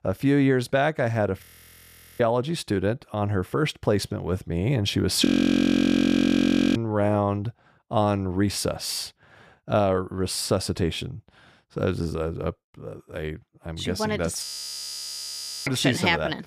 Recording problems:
audio freezing; at 1.5 s for 1 s, at 5.5 s for 1.5 s and at 14 s for 1 s

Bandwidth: 14.5 kHz